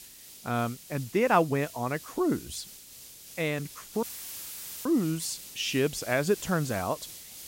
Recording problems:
hiss; noticeable; throughout; 15 dB below the speech
audio cutting out; filled with static; at 4 s for 1 s

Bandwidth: 16 kHz